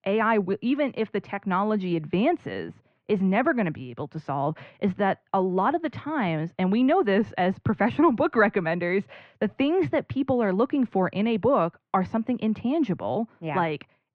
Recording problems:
muffled; very; fading above 2 kHz

